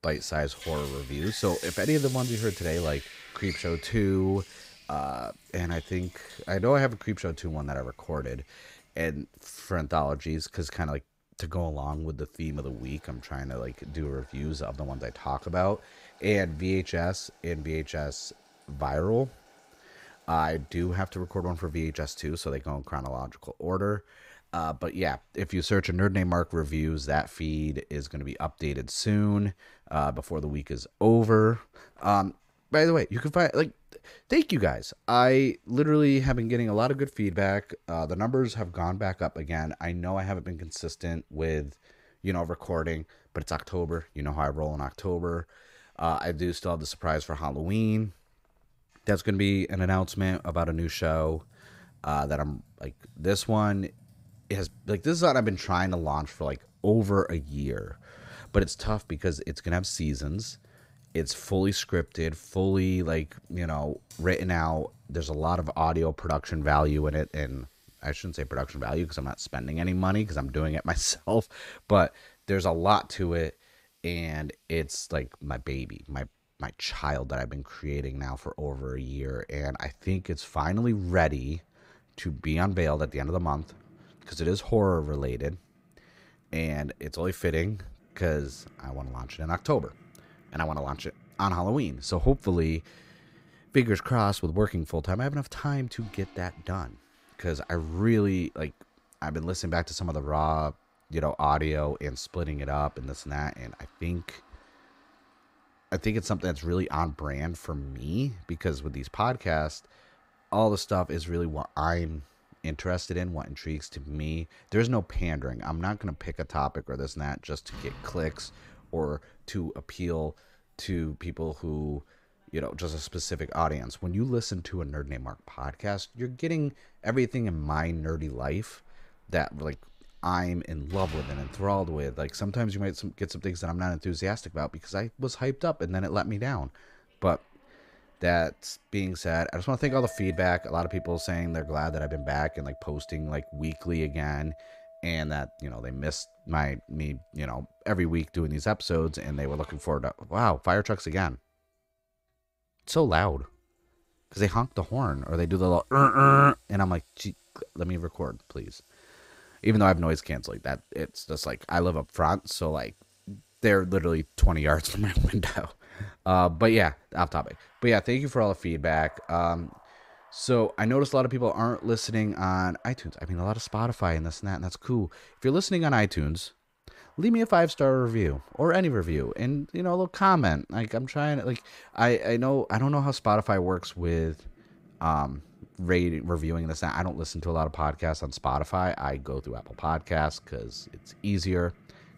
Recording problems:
household noises; faint; throughout; 20 dB below the speech

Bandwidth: 15.5 kHz